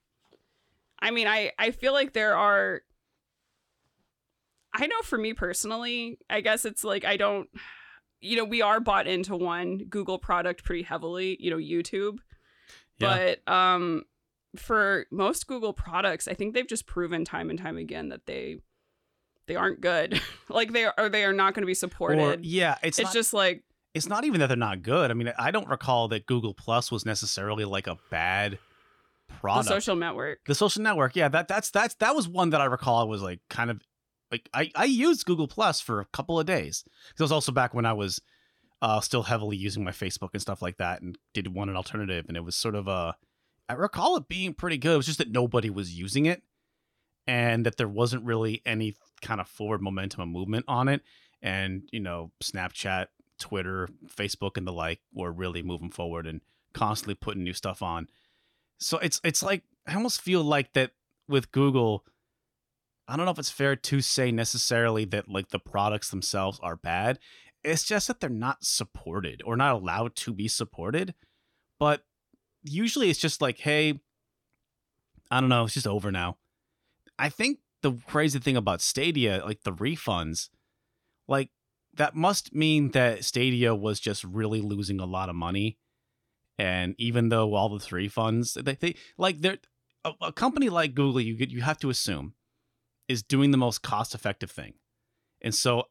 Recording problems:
none

